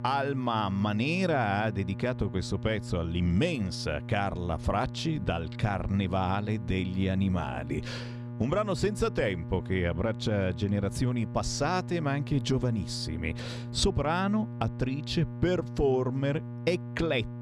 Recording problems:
electrical hum; noticeable; throughout; 60 Hz, 15 dB below the speech

